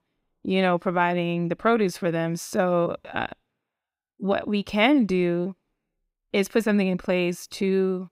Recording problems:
none

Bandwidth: 15.5 kHz